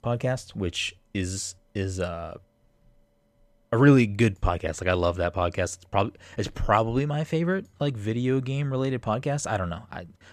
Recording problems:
none

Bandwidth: 14.5 kHz